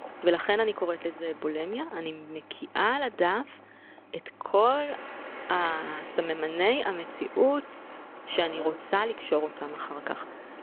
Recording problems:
phone-call audio
traffic noise; noticeable; throughout; 15 dB below the speech

